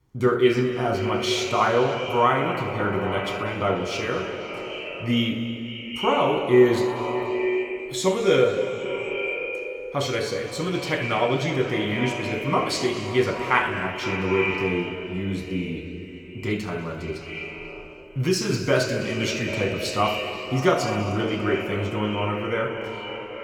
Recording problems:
echo of what is said; strong; throughout; 250 ms later, 7 dB below the speech
room echo; noticeable; dies away in 2.3 s
off-mic speech; somewhat distant

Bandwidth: 18.5 kHz